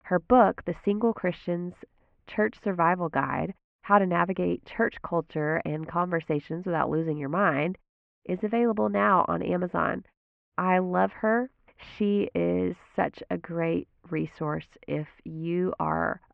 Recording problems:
muffled; very; fading above 2.5 kHz

